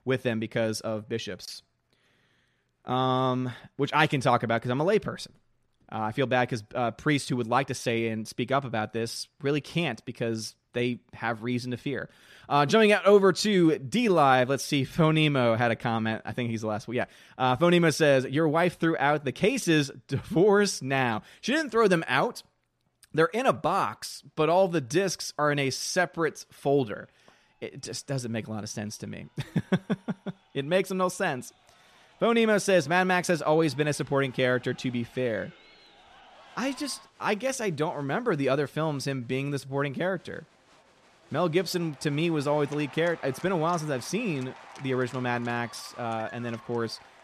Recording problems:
crowd noise; faint; throughout; 25 dB below the speech

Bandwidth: 14.5 kHz